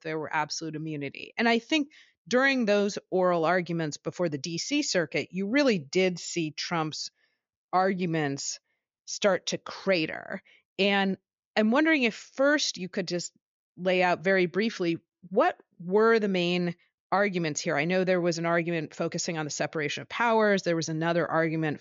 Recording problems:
high frequencies cut off; noticeable; nothing above 7 kHz

